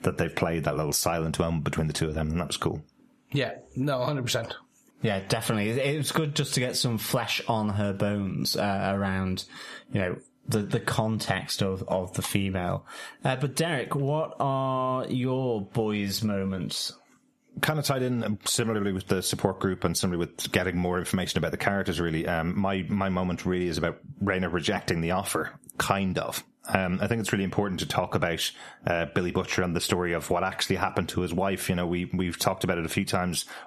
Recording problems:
squashed, flat; heavily

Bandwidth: 13.5 kHz